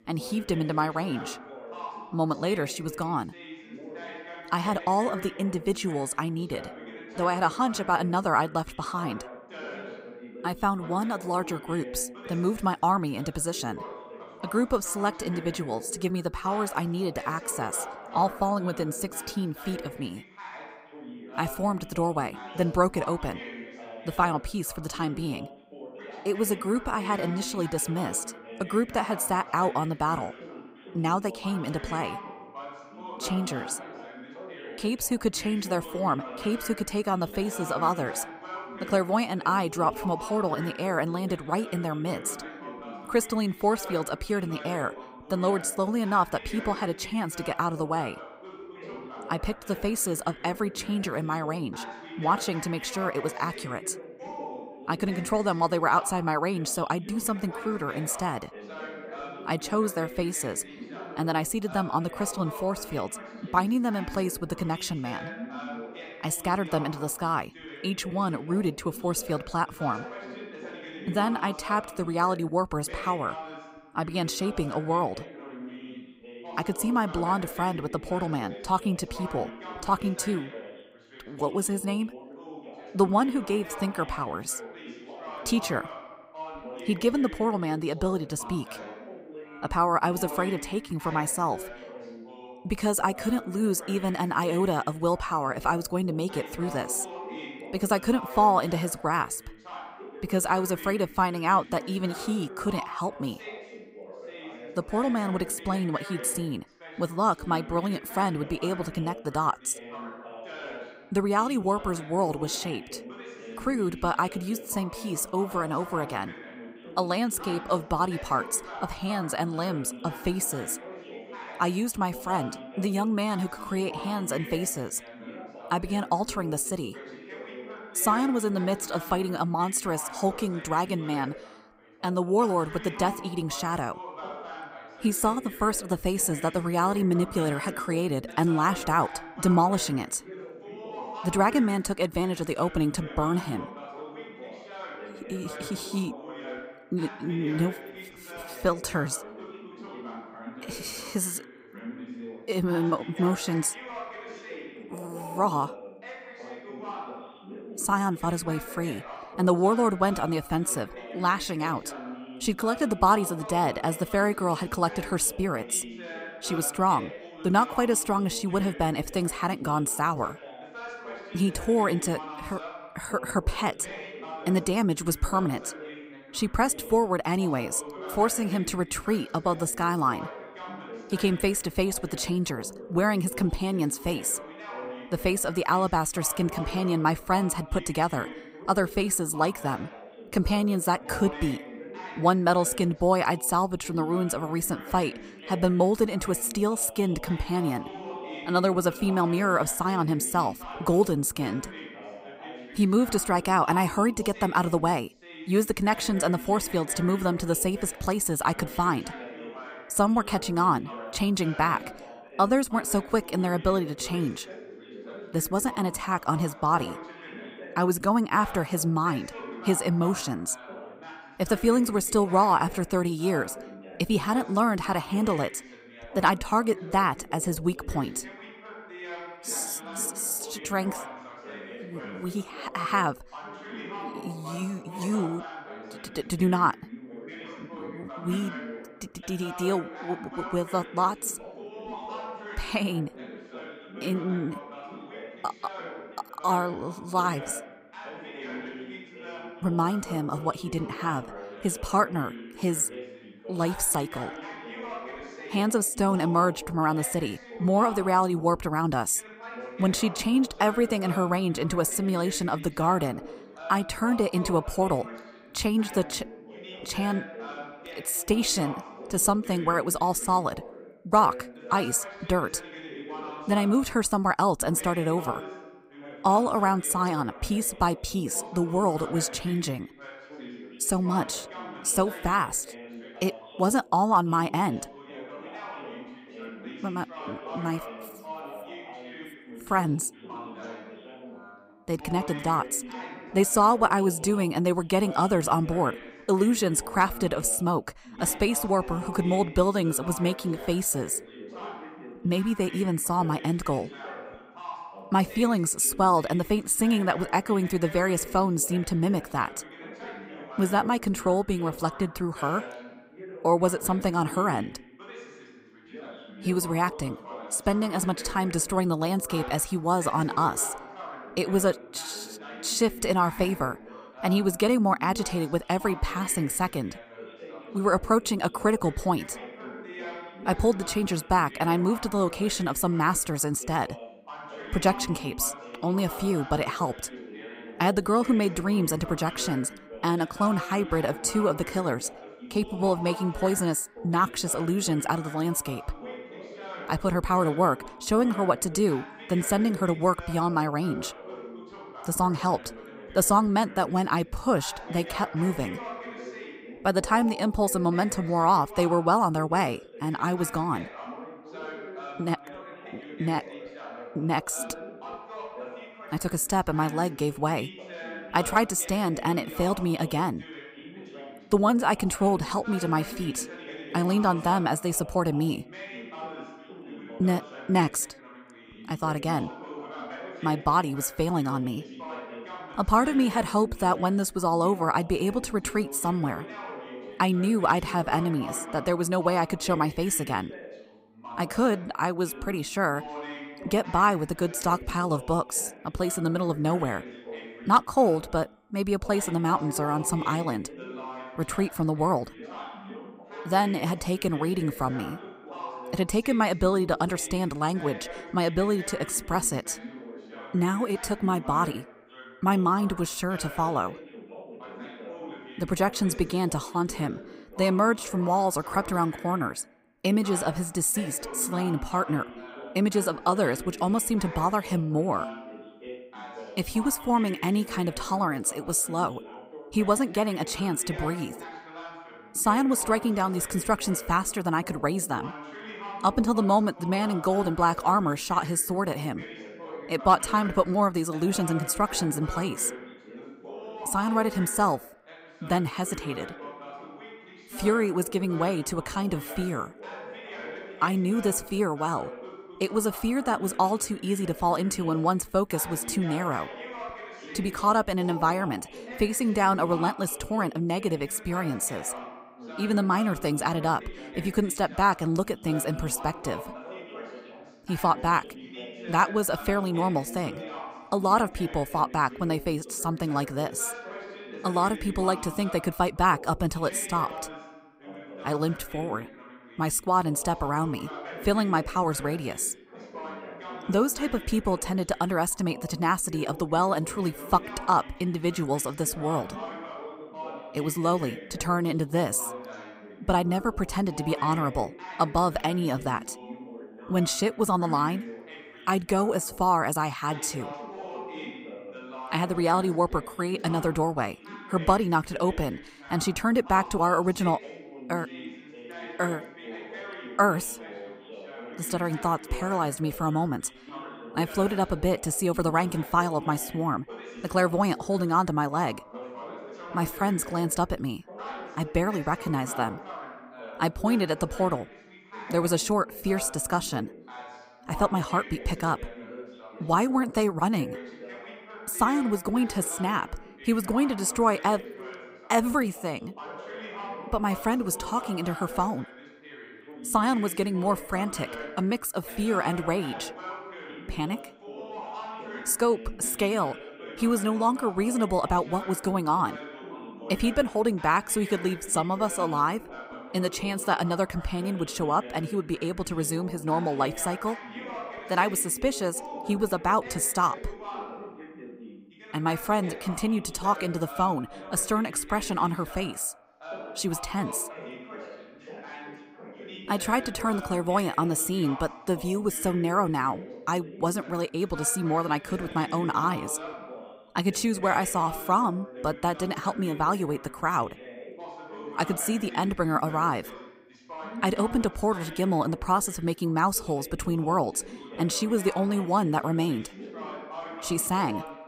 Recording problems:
background chatter; noticeable; throughout; 2 voices, 15 dB below the speech

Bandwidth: 15.5 kHz